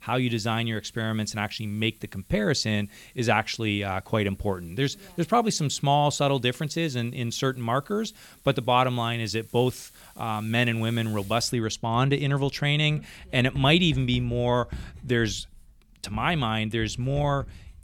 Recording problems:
household noises; faint; throughout; 20 dB below the speech

